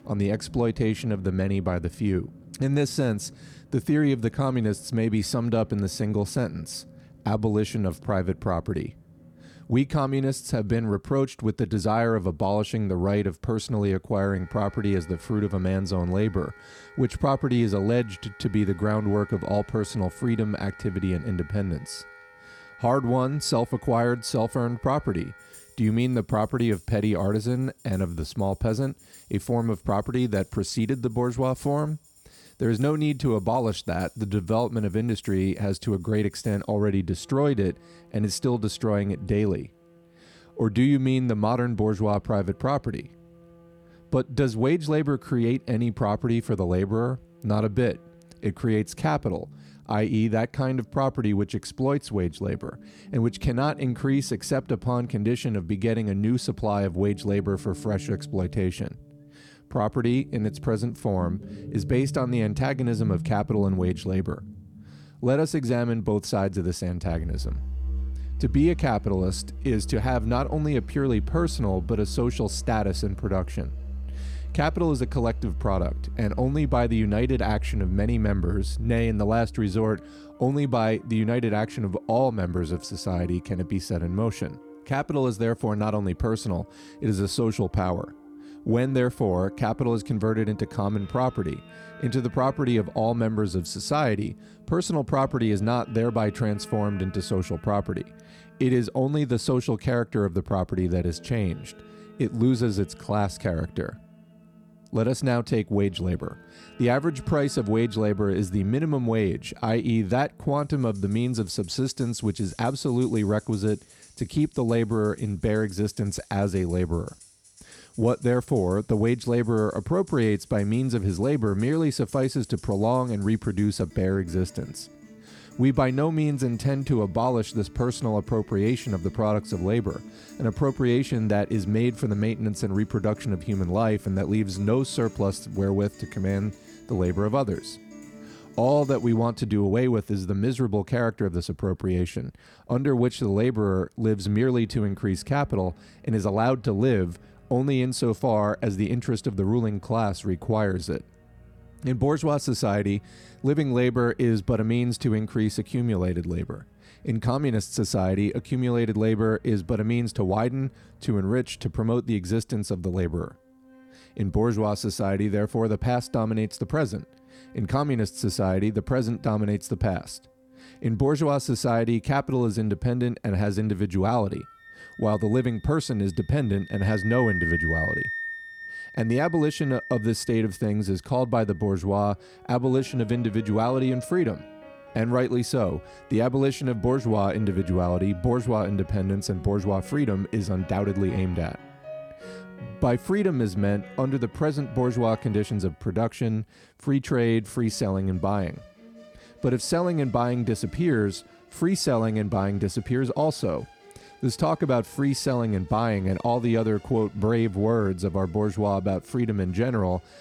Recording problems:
background music; noticeable; throughout; 15 dB below the speech

